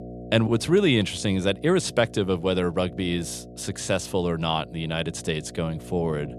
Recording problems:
electrical hum; noticeable; throughout; 60 Hz, 20 dB below the speech

